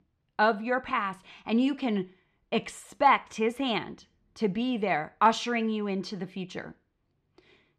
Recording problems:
muffled; slightly; fading above 3.5 kHz

